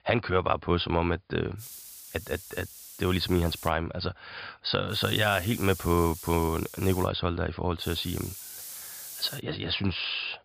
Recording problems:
high frequencies cut off; severe; nothing above 5 kHz
hiss; noticeable; from 1.5 to 3.5 s, from 5 to 7 s and from 8 to 9.5 s; 10 dB below the speech

